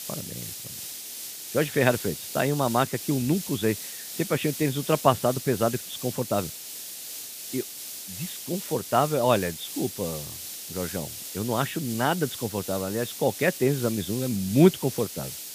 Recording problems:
high frequencies cut off; severe; nothing above 4 kHz
hiss; loud; throughout; 8 dB below the speech

